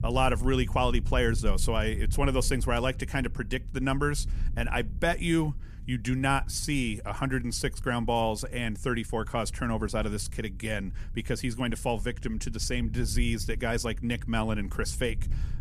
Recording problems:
low rumble; faint; throughout; 25 dB below the speech

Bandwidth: 14.5 kHz